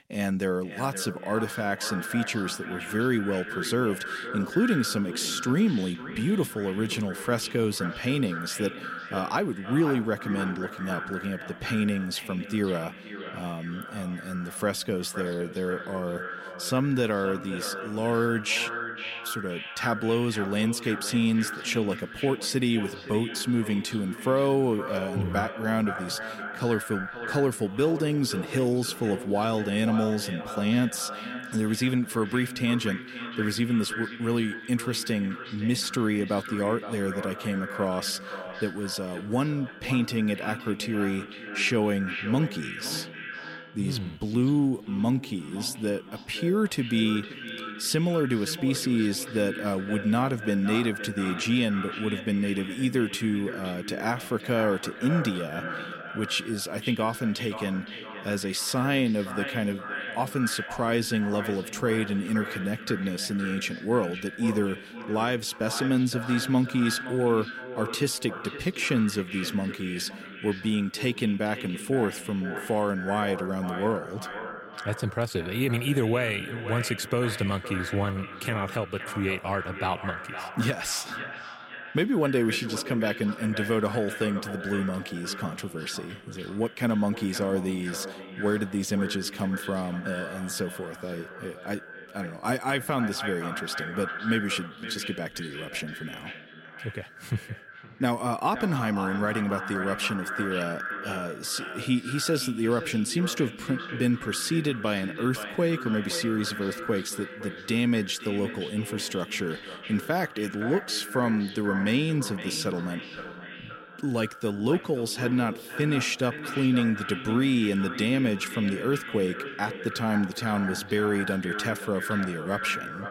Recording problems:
echo of what is said; strong; throughout; 520 ms later, 9 dB below the speech

